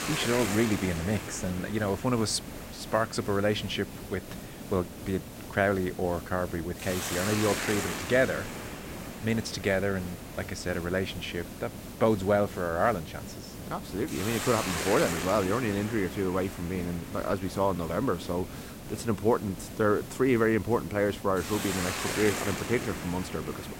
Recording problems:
hiss; loud; throughout; 7 dB below the speech
crackling; noticeable; at 7 s; 15 dB below the speech

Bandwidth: 16 kHz